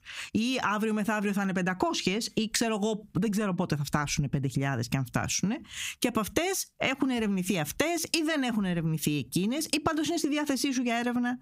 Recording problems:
squashed, flat; somewhat

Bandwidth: 15.5 kHz